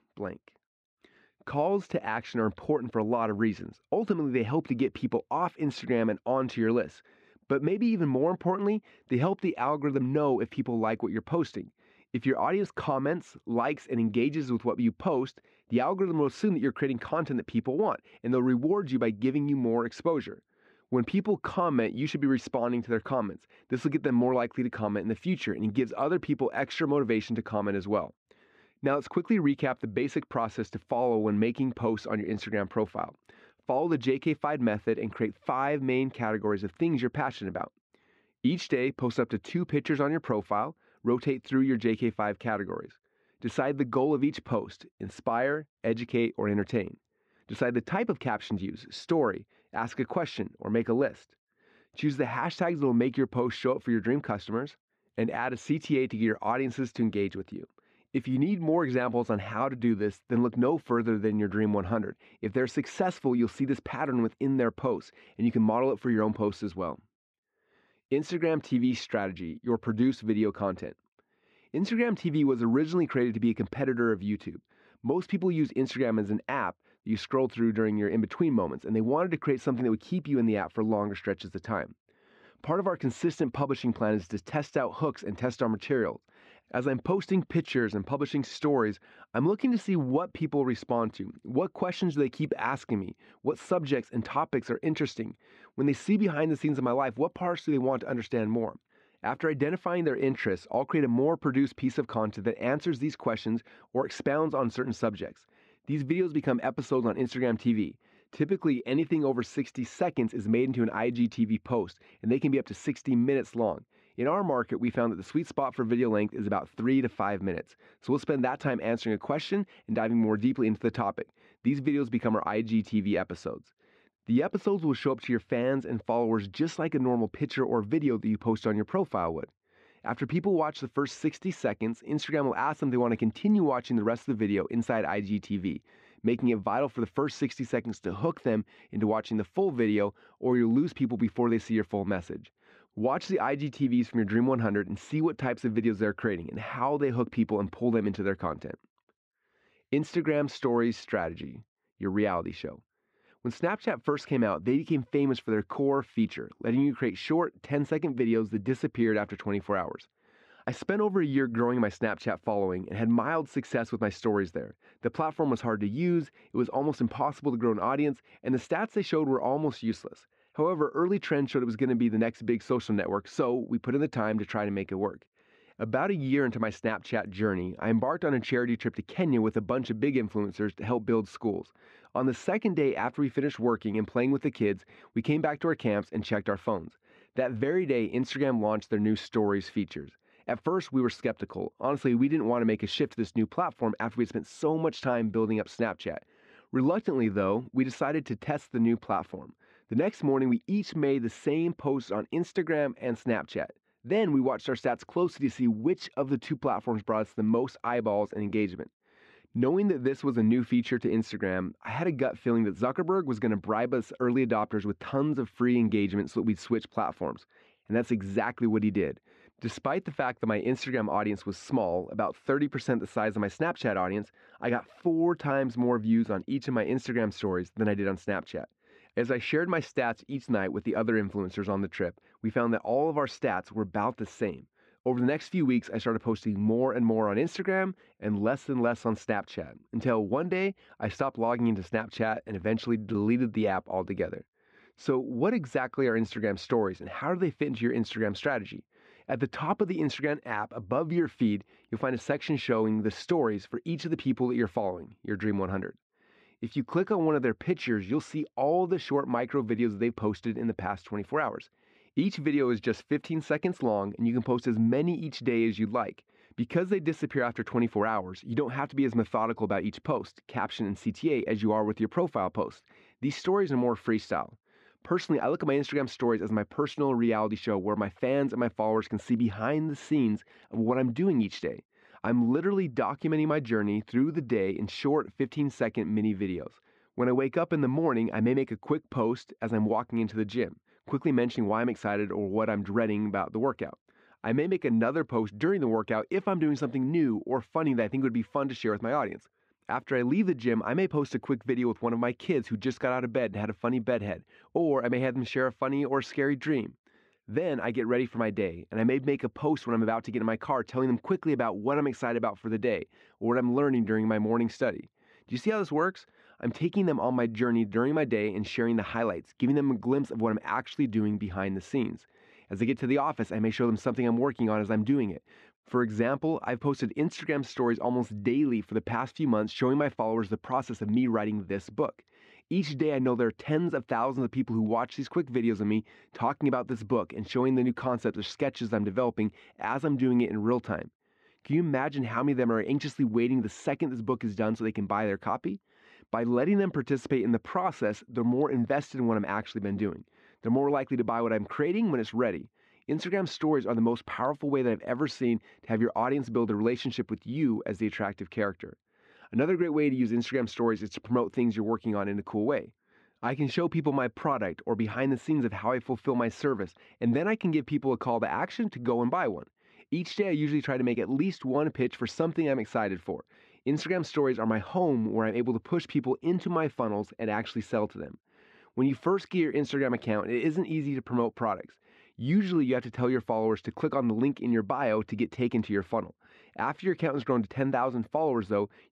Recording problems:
muffled; slightly; fading above 2.5 kHz

